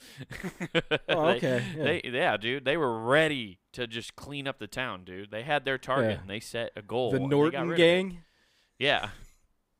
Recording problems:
none

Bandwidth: 15.5 kHz